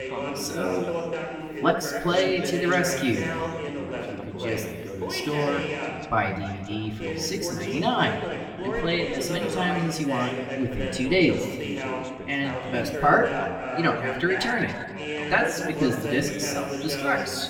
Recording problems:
room echo; slight; dies away in 2 s
off-mic speech; somewhat distant
background chatter; loud; throughout; 2 voices, 5 dB below the speech

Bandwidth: 18 kHz